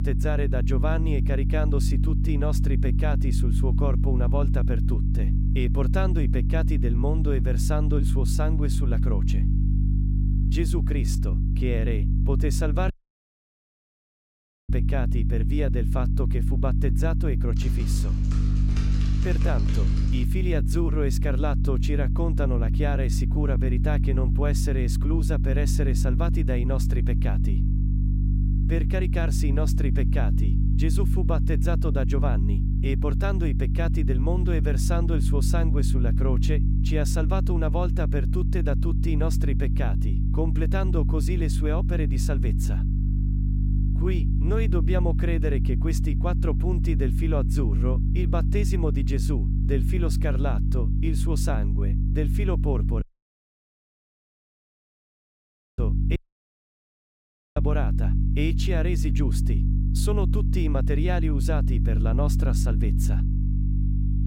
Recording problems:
electrical hum; loud; throughout; 50 Hz, 5 dB below the speech
audio cutting out; at 13 s for 2 s, at 53 s for 3 s and at 56 s for 1.5 s
keyboard typing; noticeable; from 18 to 20 s; peak 1 dB below the speech

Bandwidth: 16 kHz